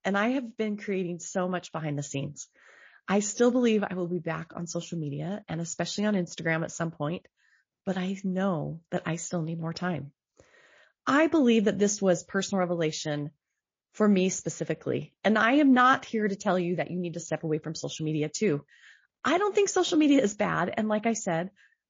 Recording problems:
garbled, watery; slightly

